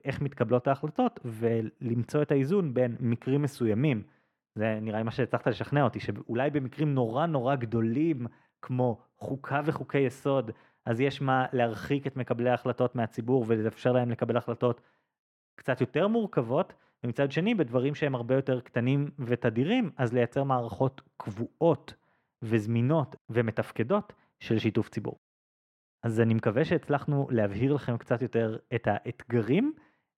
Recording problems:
muffled; slightly; fading above 3 kHz

